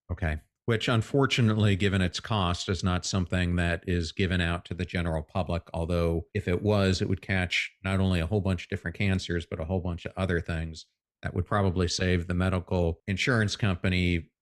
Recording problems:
none

